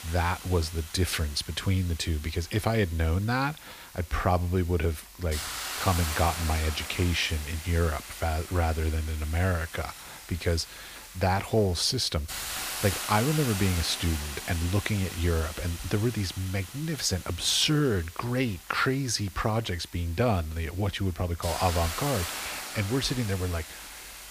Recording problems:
hiss; loud; throughout; 9 dB below the speech

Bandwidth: 15 kHz